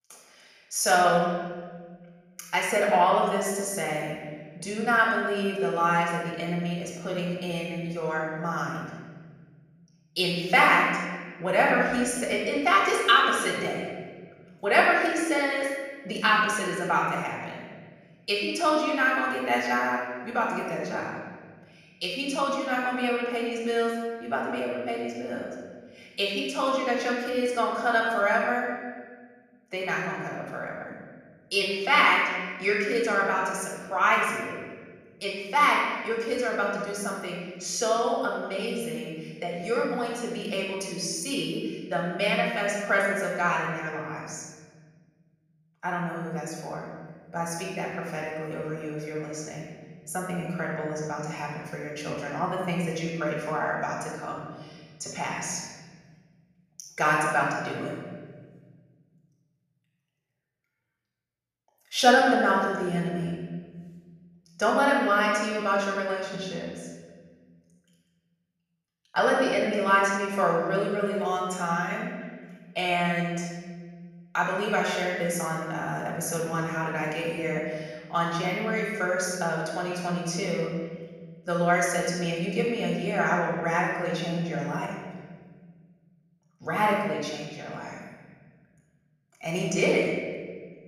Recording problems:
off-mic speech; far
room echo; noticeable; dies away in 1.7 s
echo of what is said; faint; throughout; 200 ms later, 25 dB below the speech

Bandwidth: 14.5 kHz